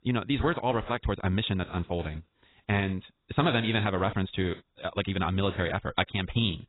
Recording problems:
garbled, watery; badly; nothing above 4 kHz
wrong speed, natural pitch; too fast; 1.5 times normal speed

